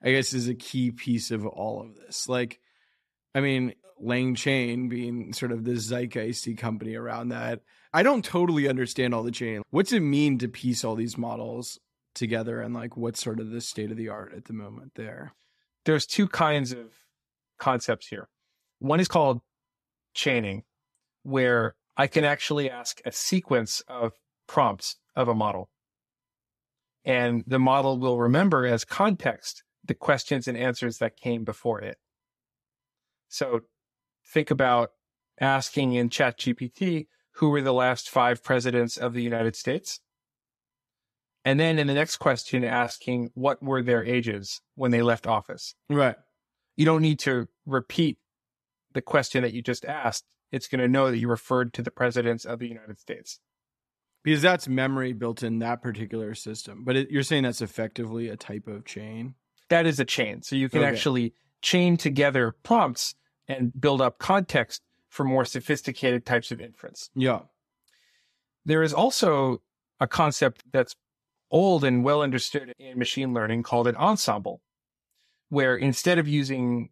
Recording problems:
uneven, jittery; strongly; from 19 to 43 s

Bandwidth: 14 kHz